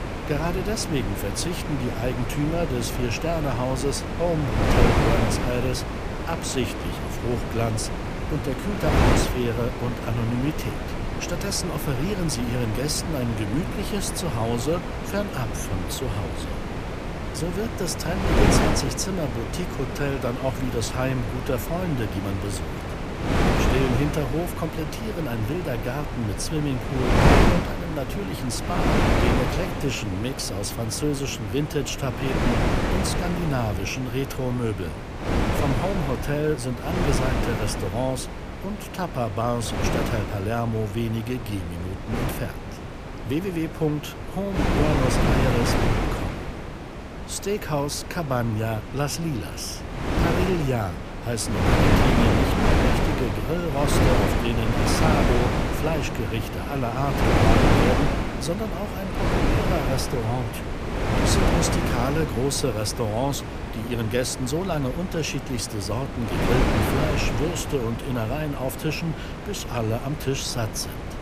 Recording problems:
wind noise on the microphone; heavy; 1 dB above the speech

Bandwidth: 15 kHz